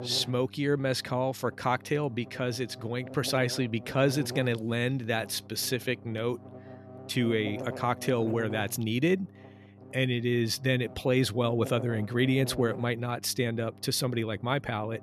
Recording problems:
electrical hum; noticeable; throughout; 50 Hz, 15 dB below the speech

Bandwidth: 13.5 kHz